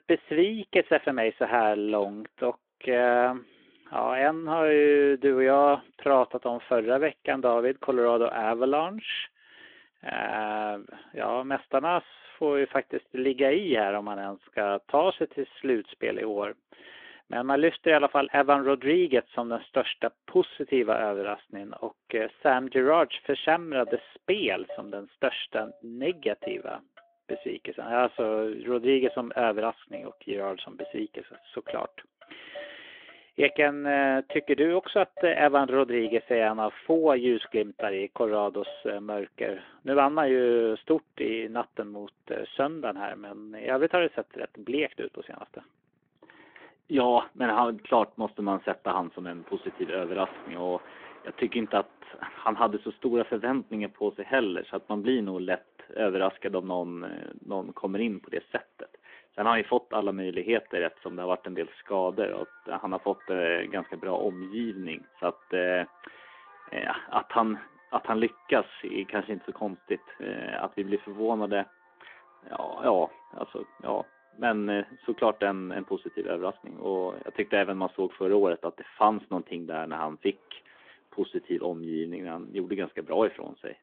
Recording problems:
phone-call audio
traffic noise; faint; throughout; 25 dB below the speech

